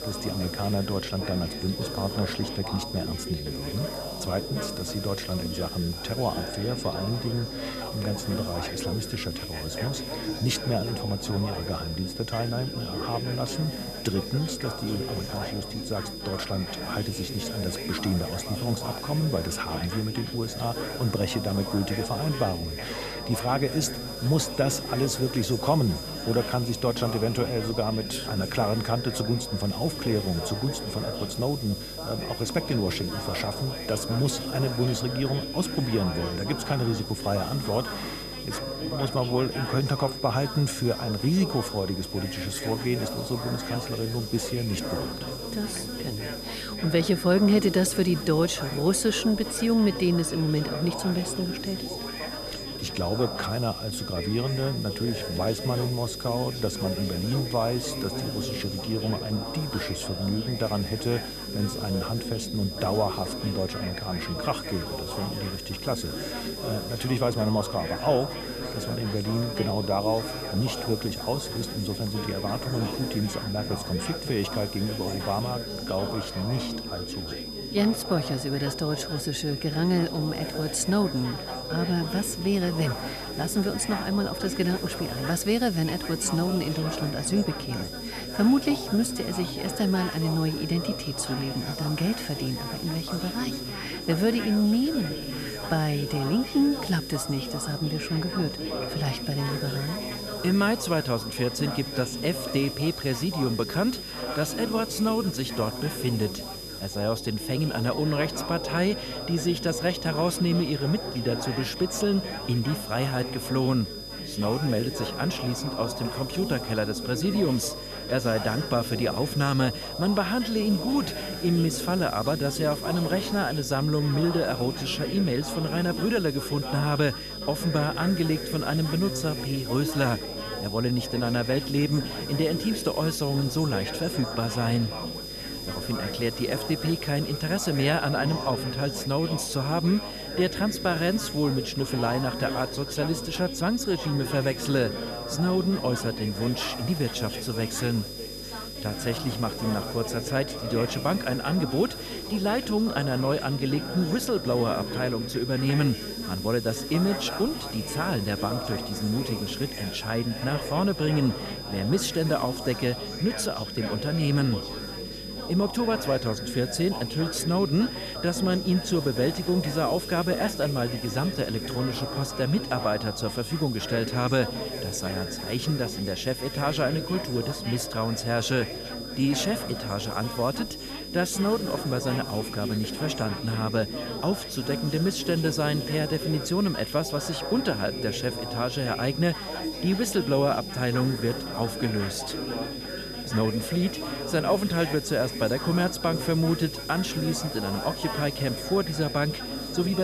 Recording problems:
high-pitched whine; loud; throughout; 5 kHz, 9 dB below the speech
background chatter; loud; throughout; 4 voices, 8 dB below the speech
electrical hum; noticeable; throughout; 50 Hz, 20 dB below the speech
hiss; noticeable; throughout; 20 dB below the speech
abrupt cut into speech; at the end

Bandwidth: 14.5 kHz